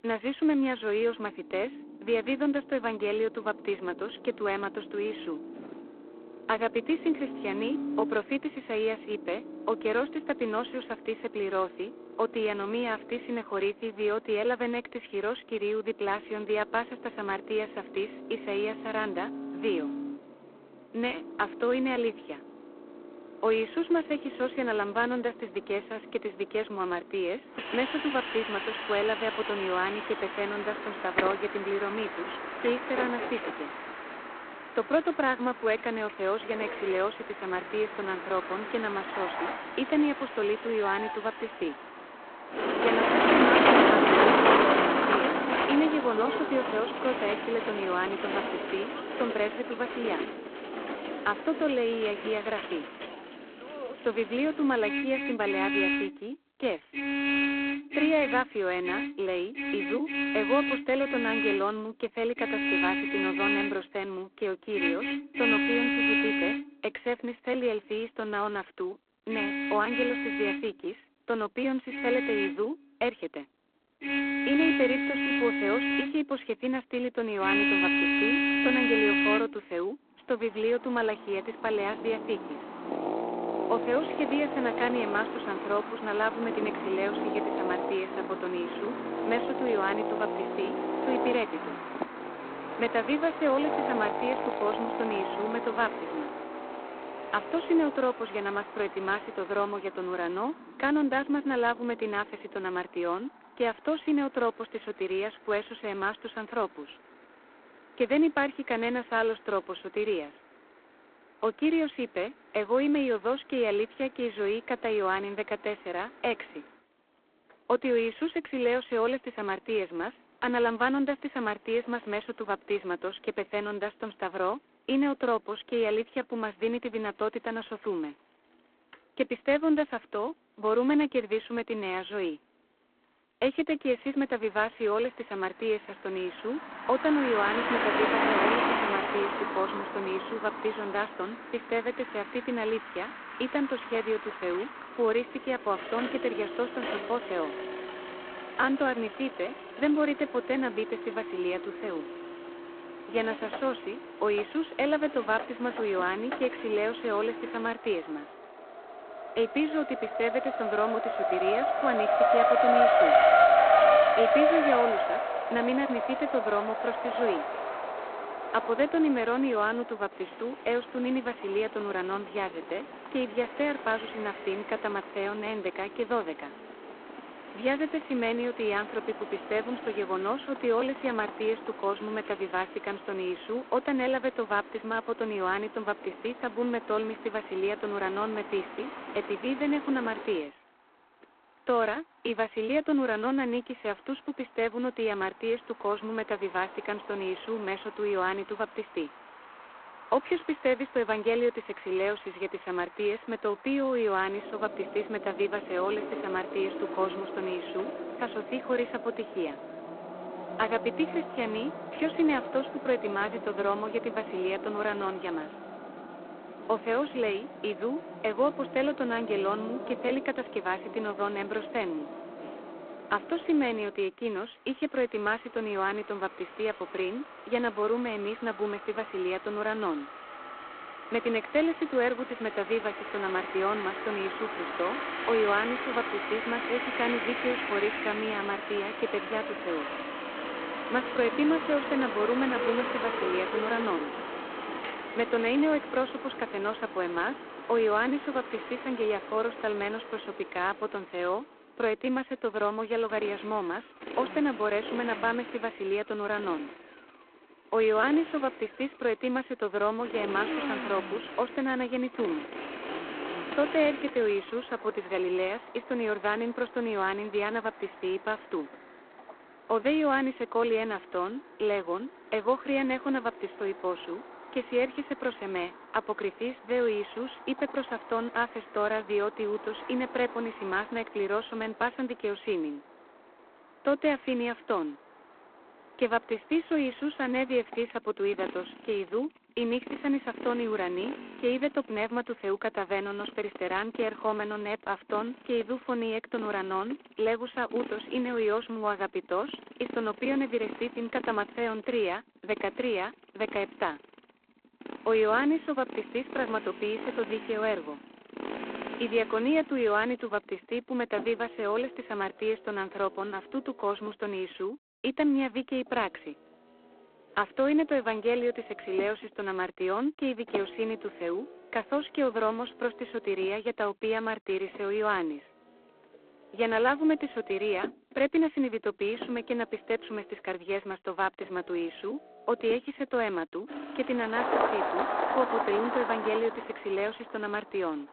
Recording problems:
phone-call audio; poor line; nothing above 3.5 kHz
traffic noise; loud; throughout; 1 dB below the speech

